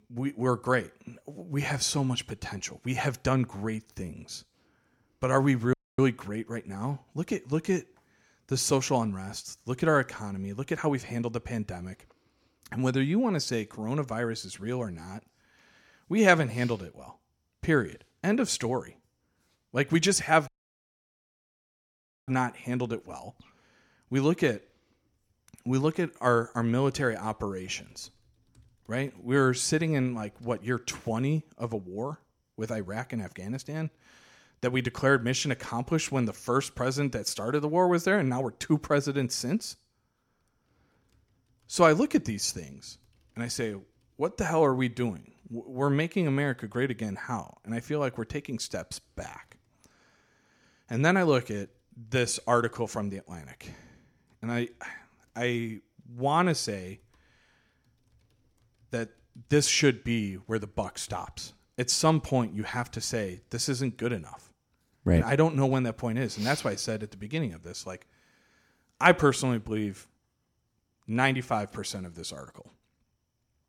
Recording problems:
audio cutting out; at 5.5 s and at 20 s for 2 s

